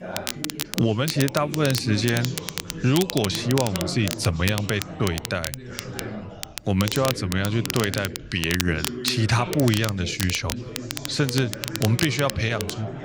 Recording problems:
crackle, like an old record; loud; 8 dB below the speech
background chatter; noticeable; throughout; 4 voices, 10 dB below the speech

